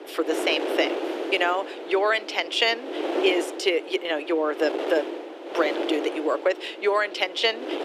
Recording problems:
thin; very; fading below 300 Hz
wind noise on the microphone; heavy; 8 dB below the speech

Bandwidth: 14.5 kHz